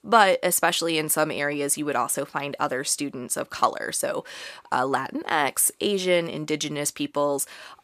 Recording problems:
none

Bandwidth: 14.5 kHz